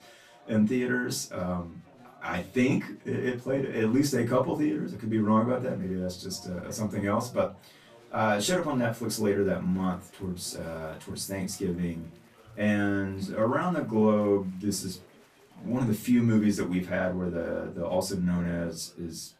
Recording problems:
off-mic speech; far
room echo; very slight; dies away in 0.2 s
chatter from many people; faint; throughout; 25 dB below the speech

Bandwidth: 14.5 kHz